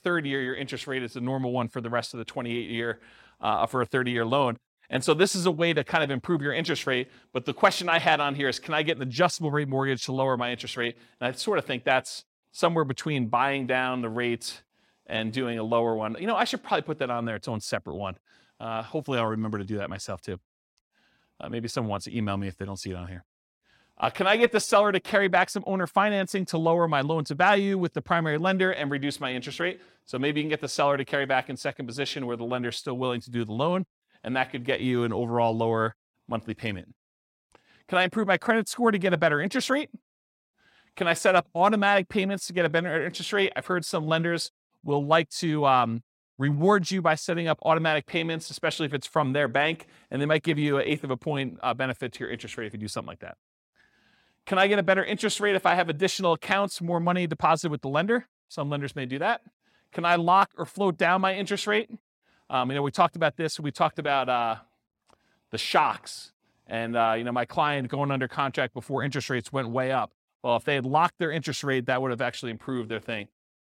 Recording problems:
none

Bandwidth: 16.5 kHz